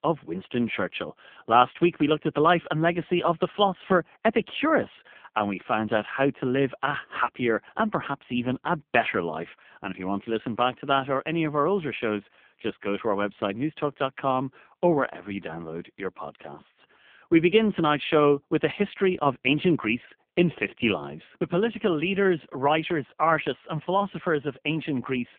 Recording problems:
phone-call audio; poor line; nothing above 3.5 kHz

